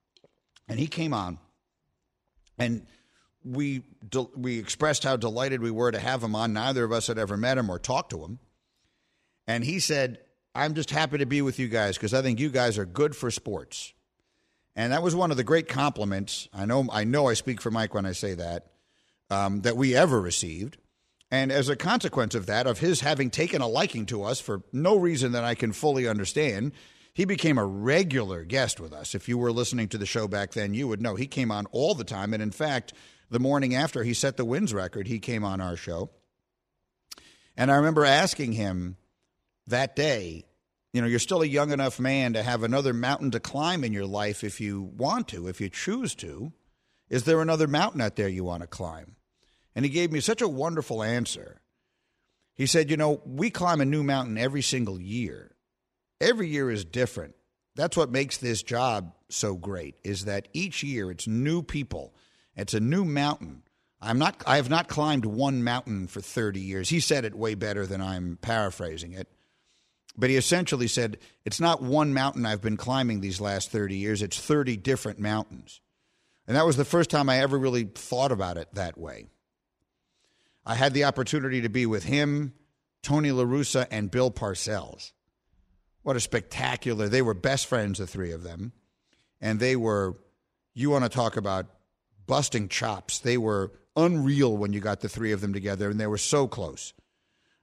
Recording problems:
none

